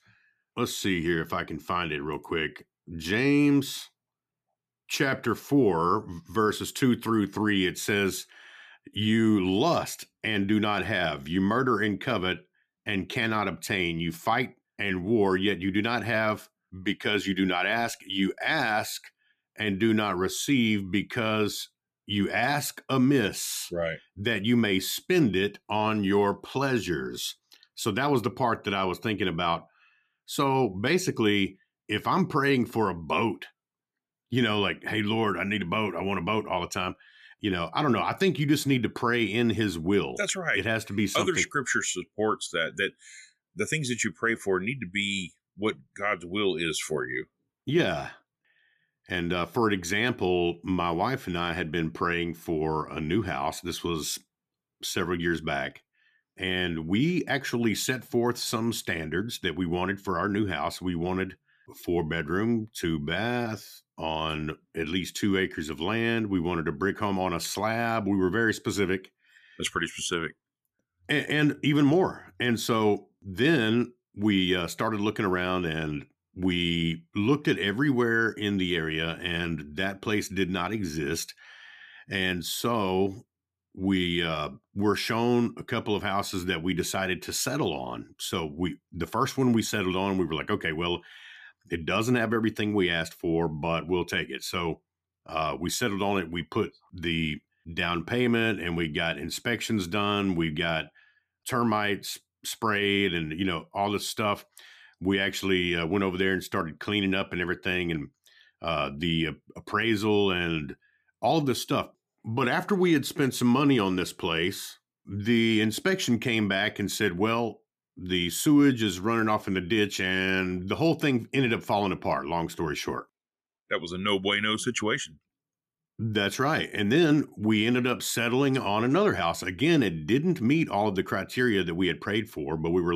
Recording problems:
abrupt cut into speech; at the end

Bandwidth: 14.5 kHz